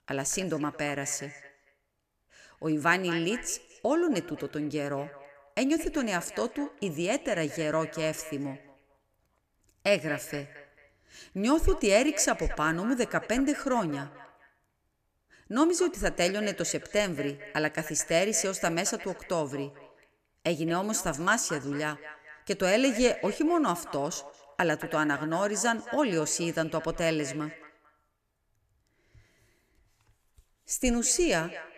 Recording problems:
echo of what is said; noticeable; throughout; 220 ms later, 15 dB below the speech

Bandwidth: 14.5 kHz